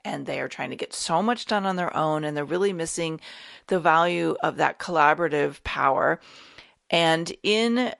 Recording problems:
garbled, watery; slightly; nothing above 11 kHz

